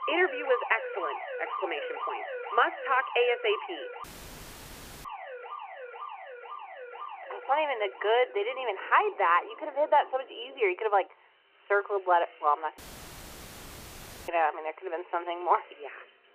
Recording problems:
phone-call audio; nothing above 3 kHz
alarms or sirens; noticeable; throughout; 10 dB below the speech
machinery noise; faint; throughout; 25 dB below the speech
audio cutting out; filled with static; at 4 s for 1 s and at 13 s for 1.5 s

